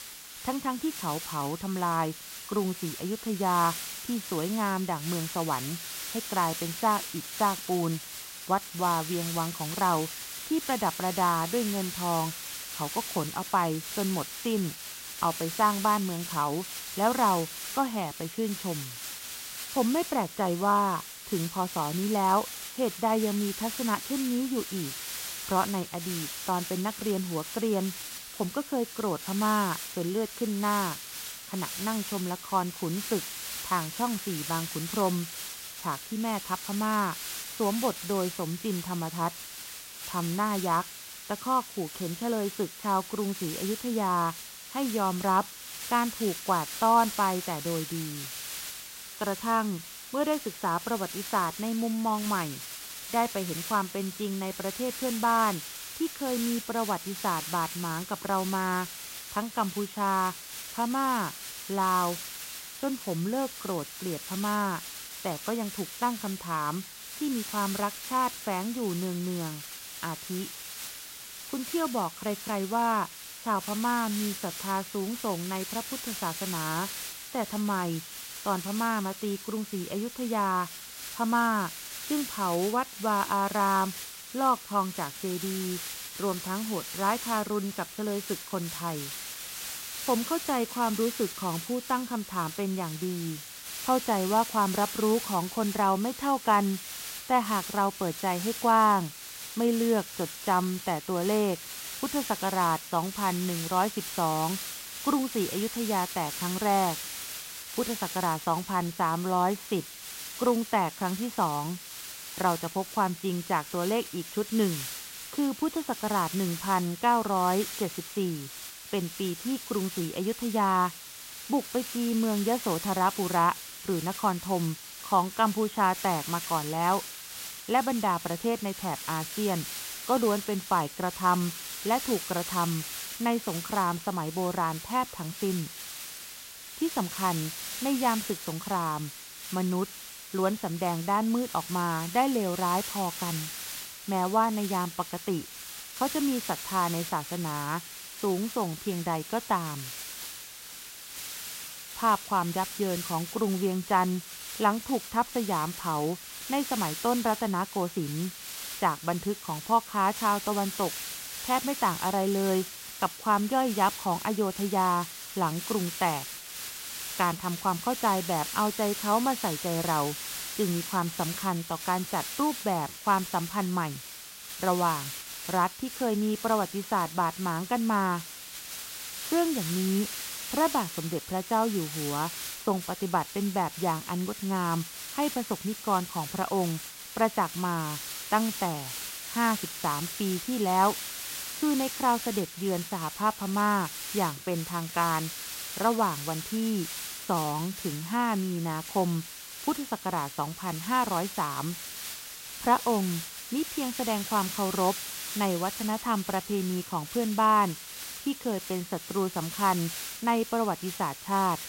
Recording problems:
high frequencies cut off; severe; nothing above 4 kHz
hiss; loud; throughout; 7 dB below the speech

